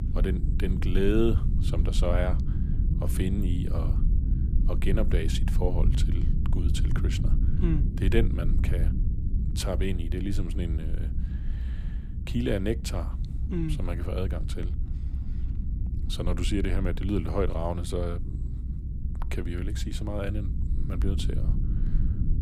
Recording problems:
low rumble; loud; throughout; 9 dB below the speech

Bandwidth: 15 kHz